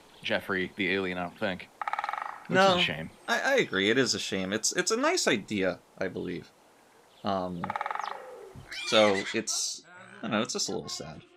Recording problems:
animal sounds; loud; throughout; 8 dB below the speech

